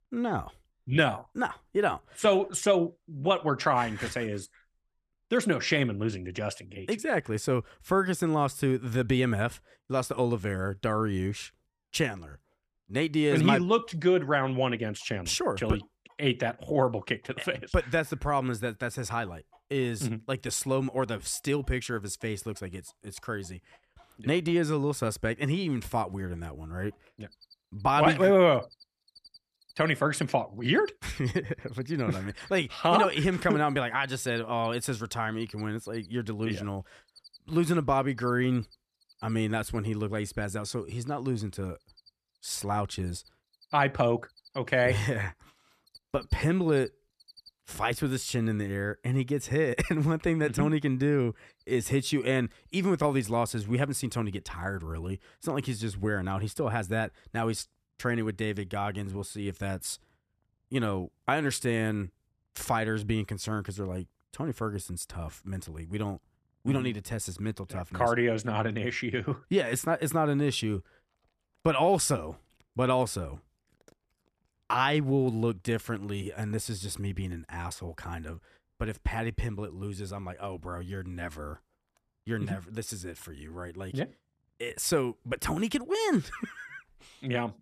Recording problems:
animal sounds; faint; throughout; 30 dB below the speech

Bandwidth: 14 kHz